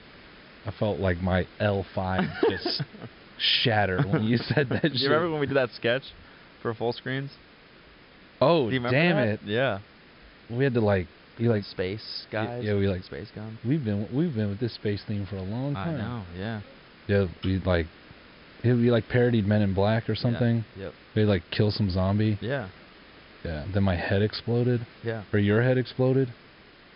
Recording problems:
high frequencies cut off; noticeable; nothing above 5.5 kHz
hiss; faint; throughout; 25 dB below the speech

